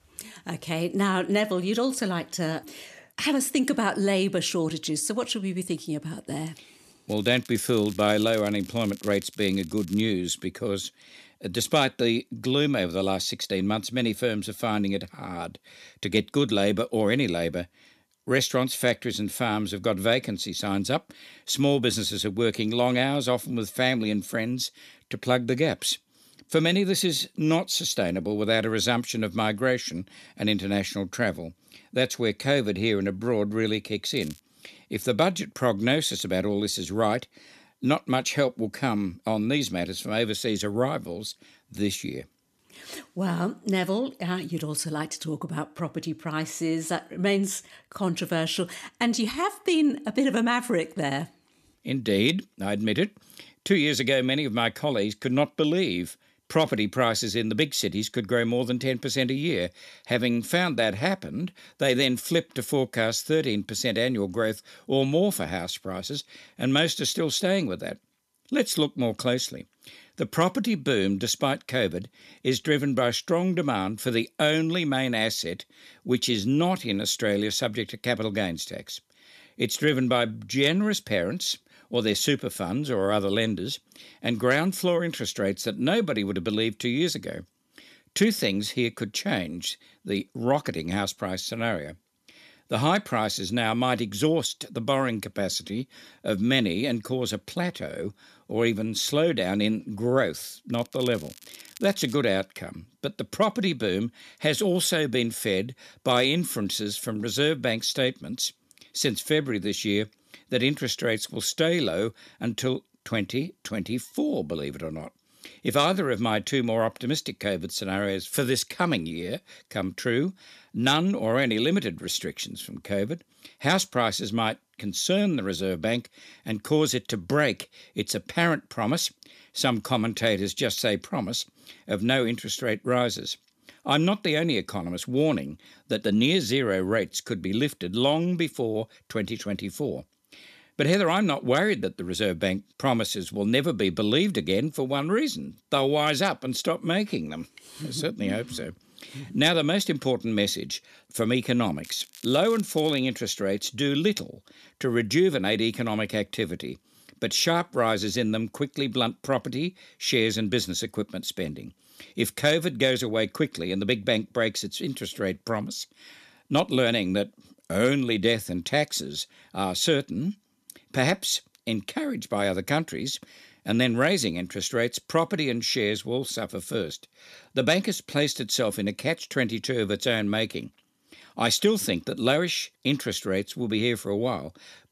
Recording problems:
crackling; noticeable; 4 times, first at 7 s; 20 dB below the speech

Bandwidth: 14.5 kHz